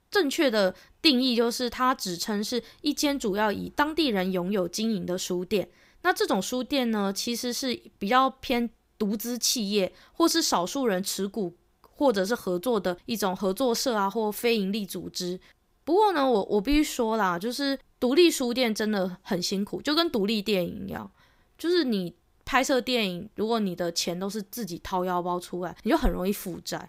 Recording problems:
uneven, jittery; slightly; from 6.5 to 21 s

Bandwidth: 15.5 kHz